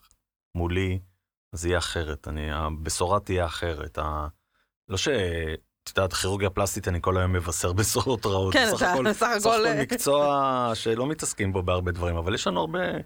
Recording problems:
none

